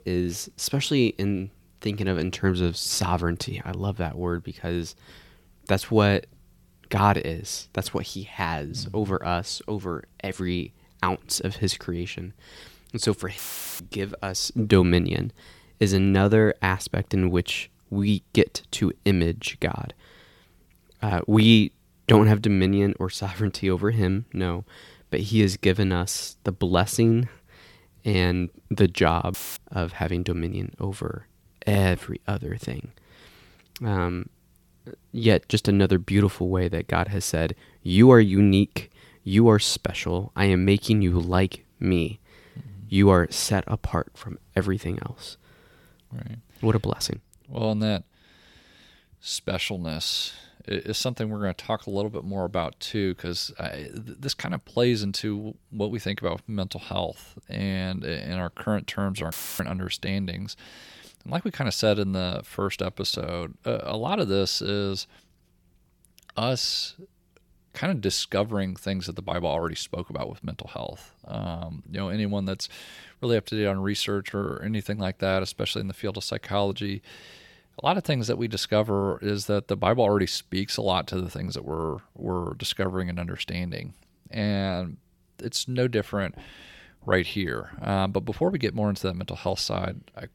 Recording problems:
audio cutting out; filled with static; at 13 s, at 29 s and at 59 s

